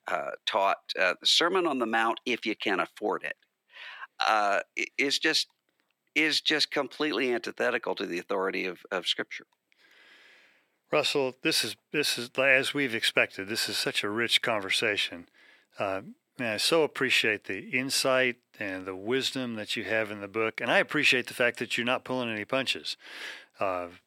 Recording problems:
thin; somewhat; fading below 400 Hz

